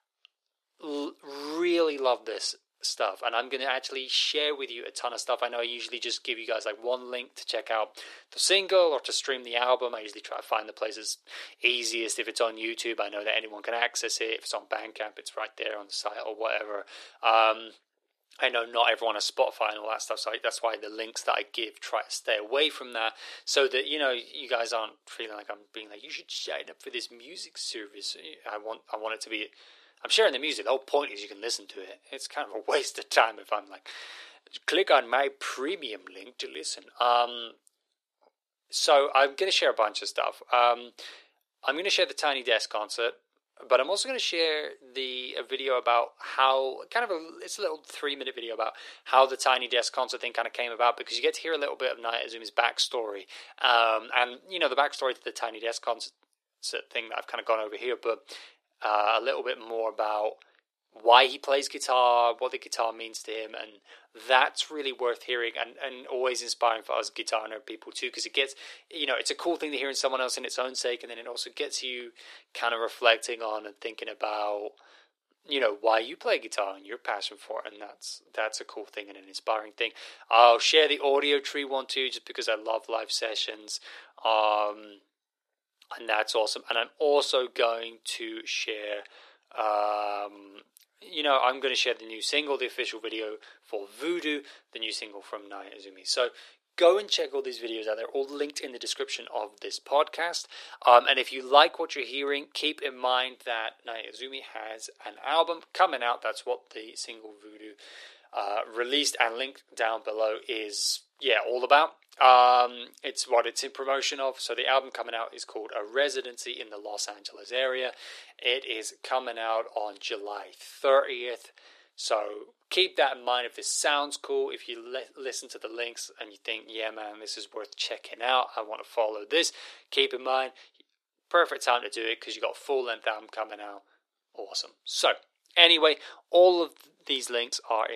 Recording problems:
thin; very; fading below 400 Hz
abrupt cut into speech; at the end

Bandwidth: 13.5 kHz